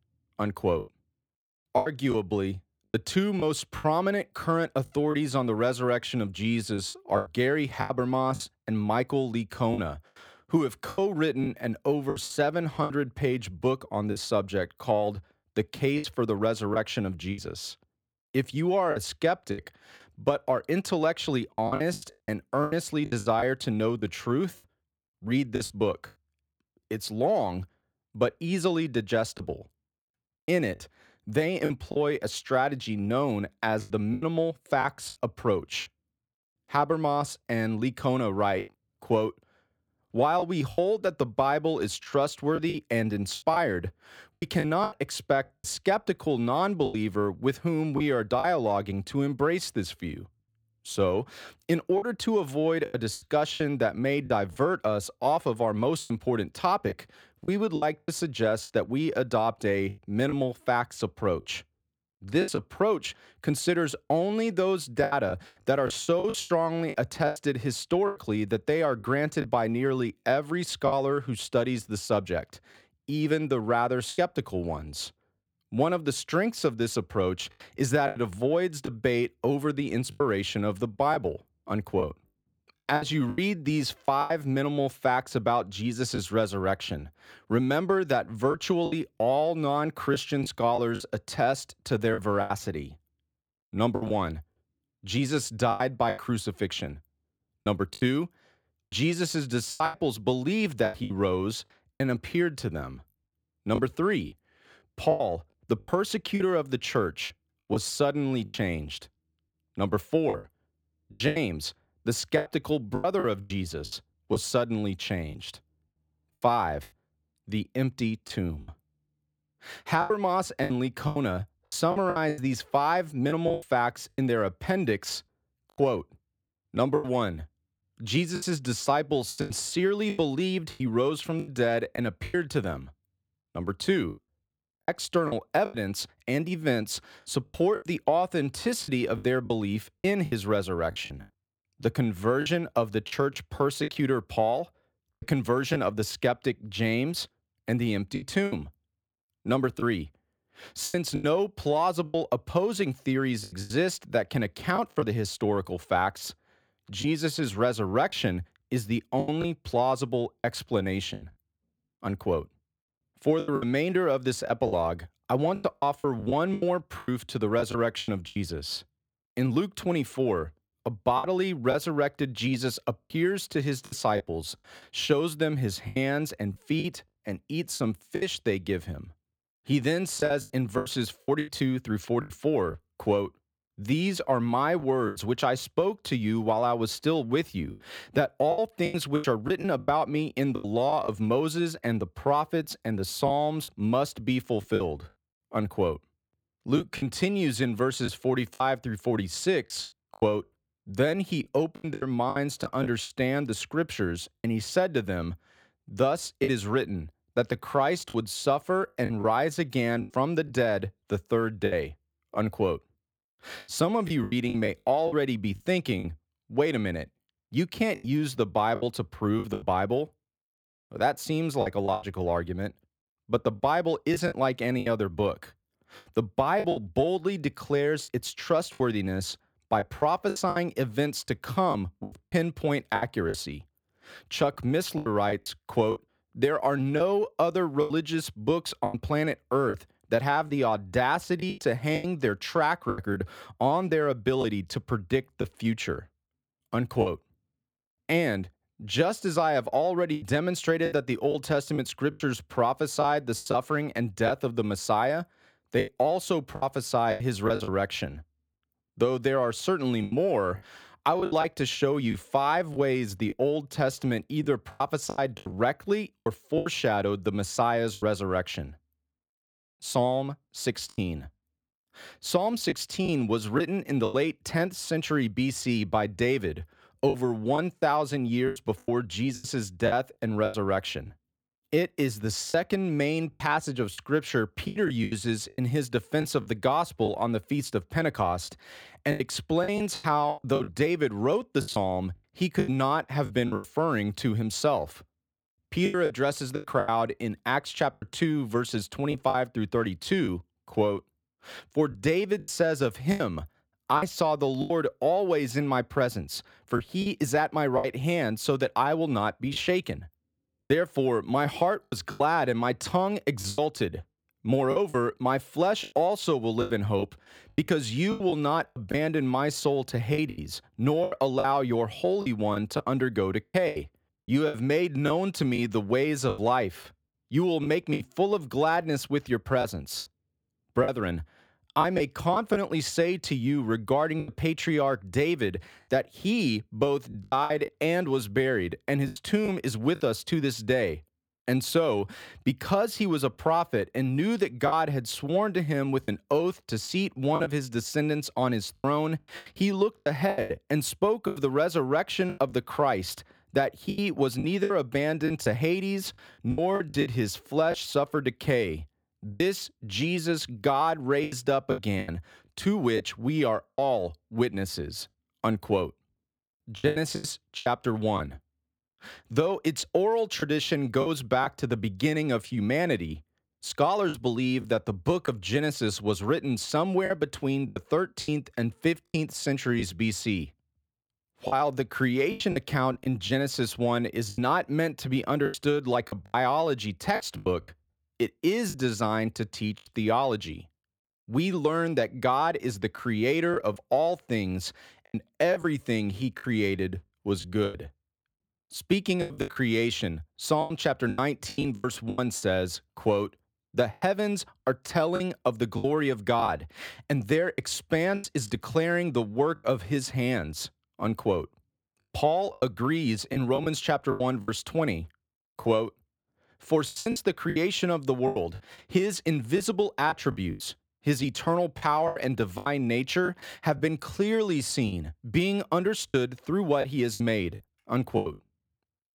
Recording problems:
choppy; very; 8% of the speech affected

